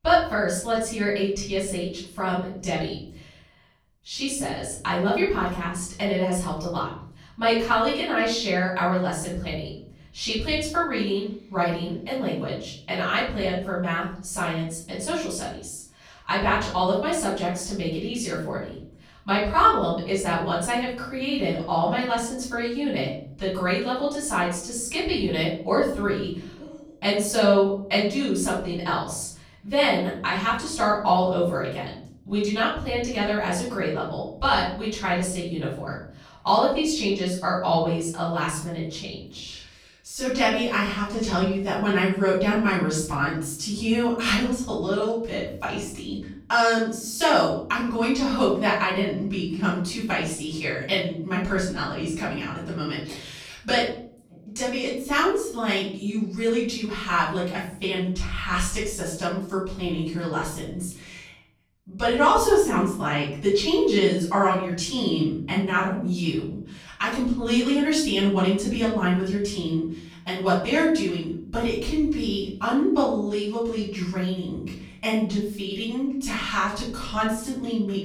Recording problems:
off-mic speech; far
room echo; noticeable; dies away in 0.8 s

